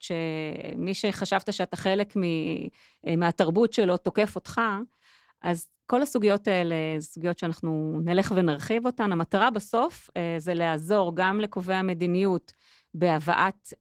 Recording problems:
garbled, watery; slightly; nothing above 19 kHz

